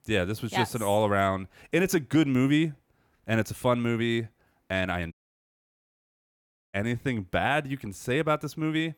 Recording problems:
audio cutting out; at 5 s for 1.5 s

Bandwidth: 18.5 kHz